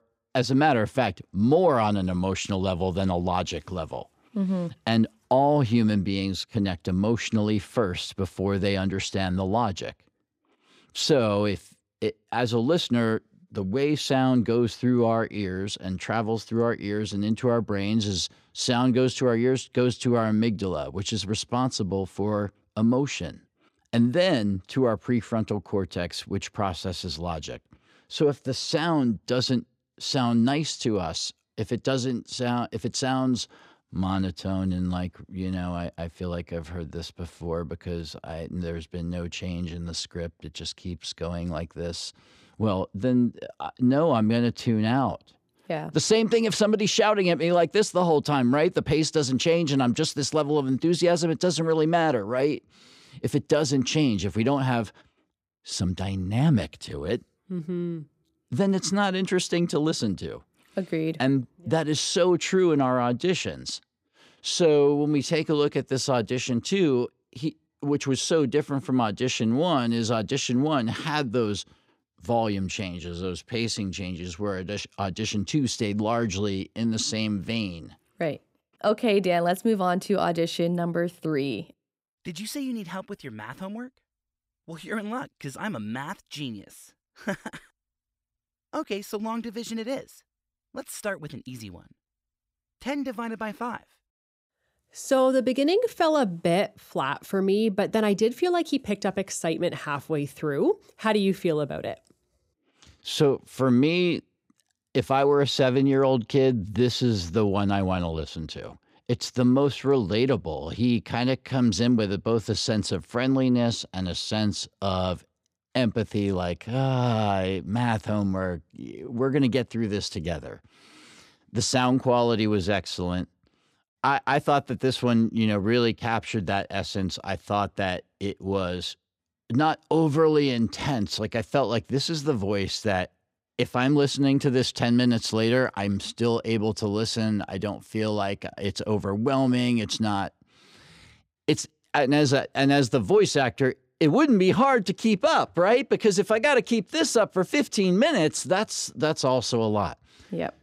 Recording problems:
none

